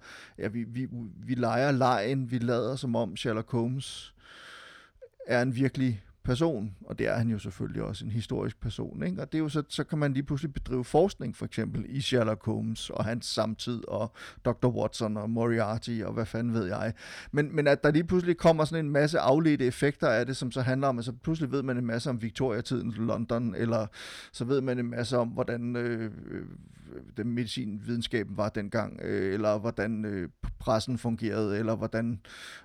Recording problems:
none

